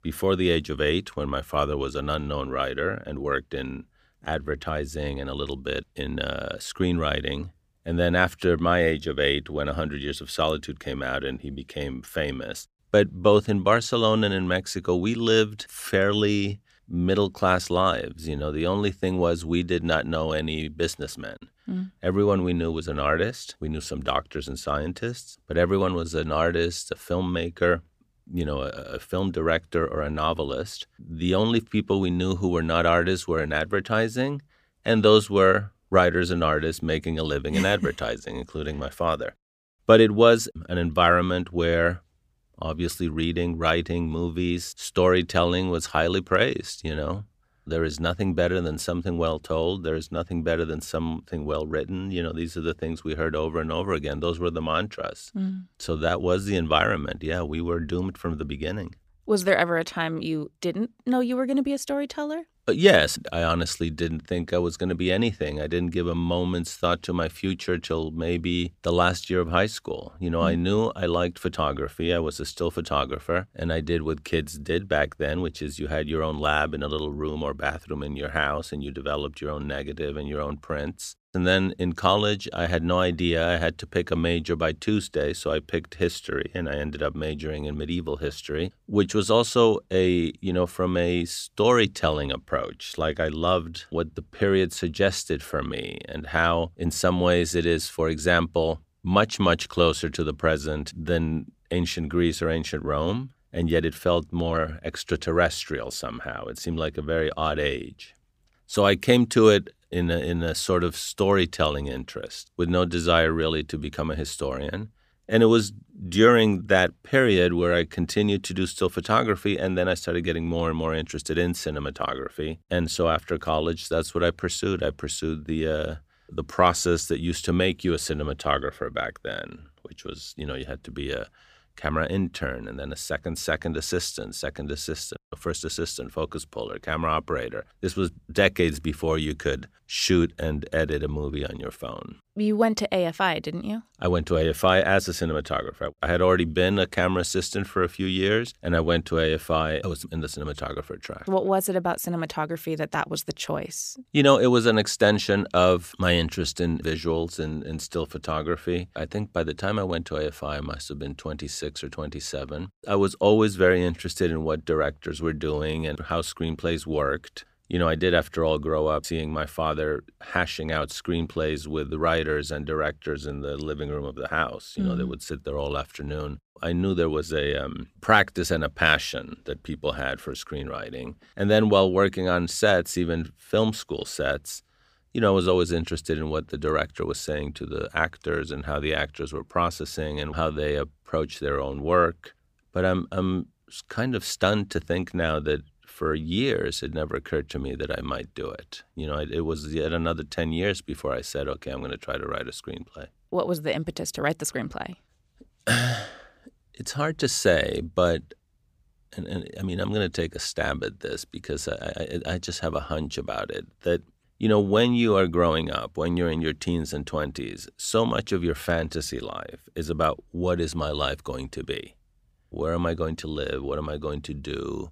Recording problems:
none

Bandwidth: 15 kHz